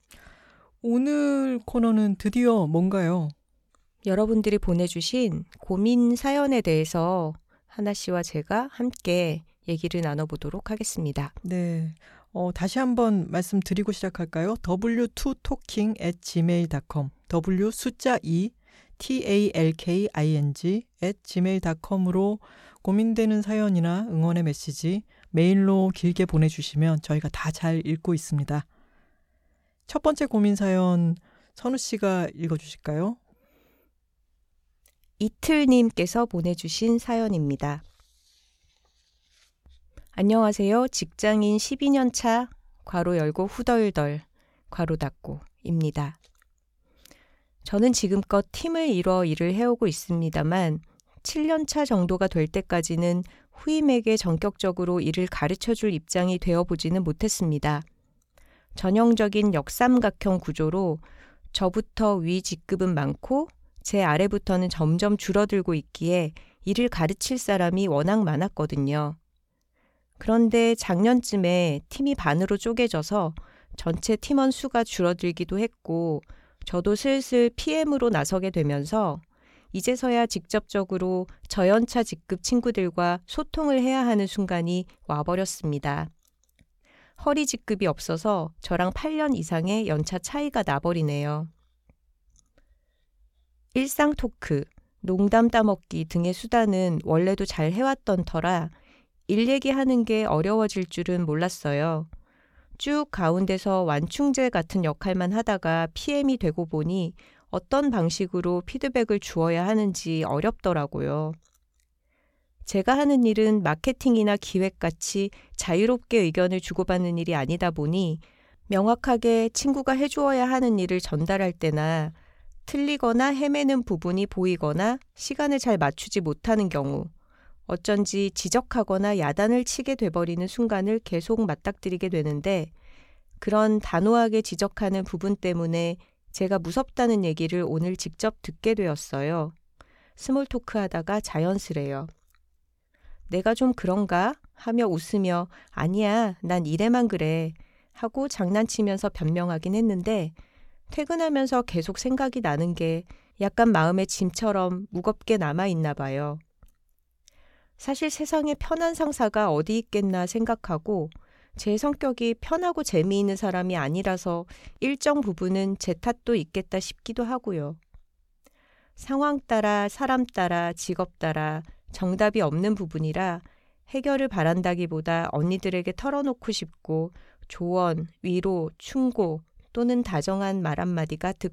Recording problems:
none

